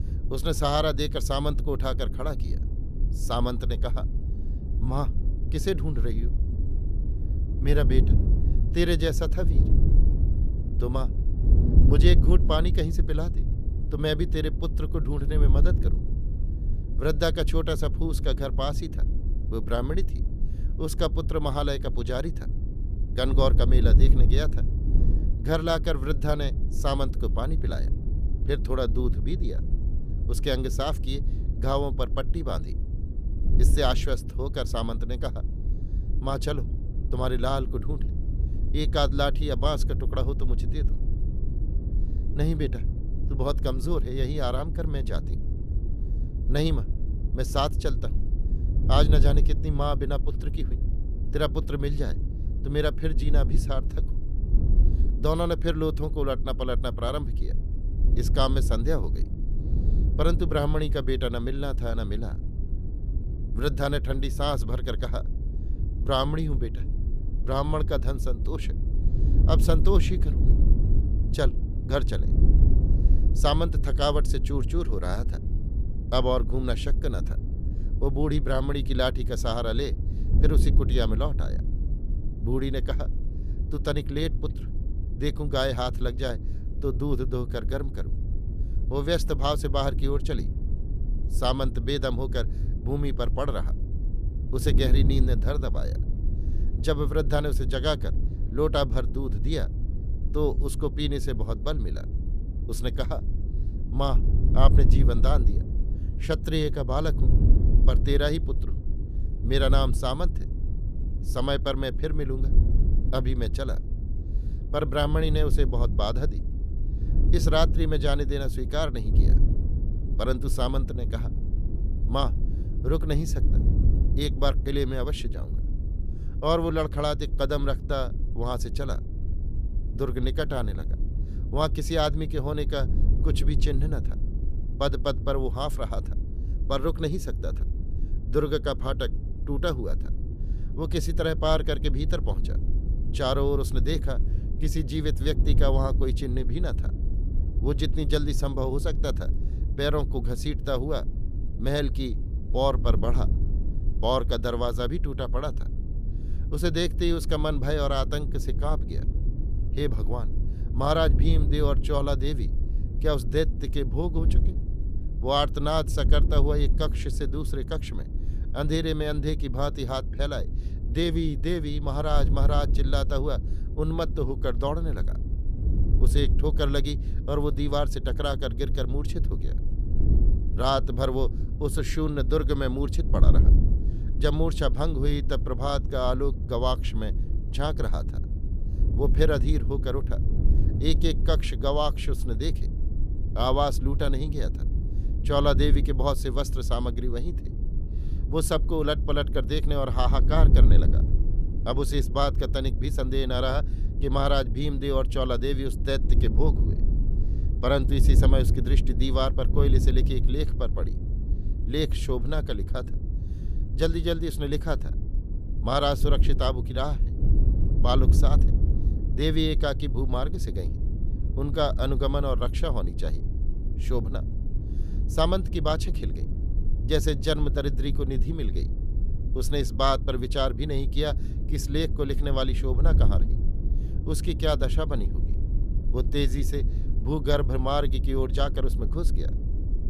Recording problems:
wind noise on the microphone; occasional gusts; 15 dB below the speech

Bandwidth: 14.5 kHz